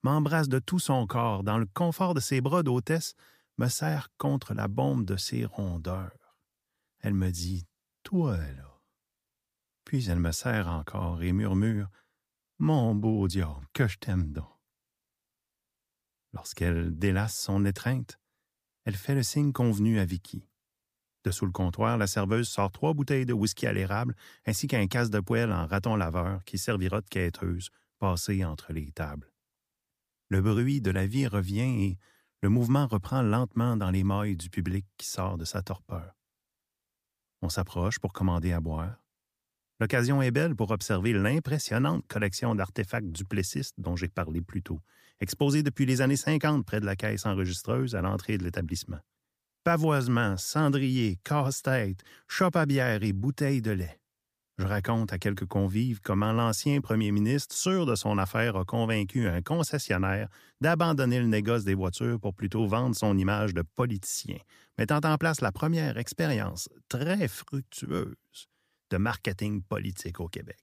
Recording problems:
none

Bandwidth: 15 kHz